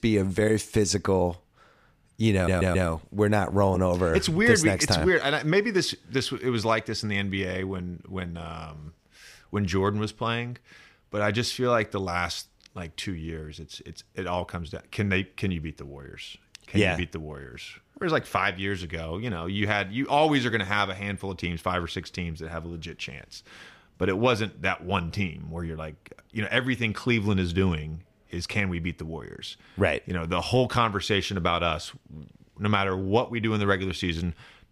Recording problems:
audio stuttering; at 2.5 s

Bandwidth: 15 kHz